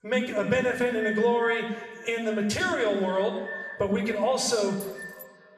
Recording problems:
echo of what is said; noticeable; throughout; 290 ms later, 10 dB below the speech
room echo; noticeable; dies away in 1 s
off-mic speech; somewhat distant
jangling keys; faint; at 5 s; peak 20 dB below the speech

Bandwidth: 14 kHz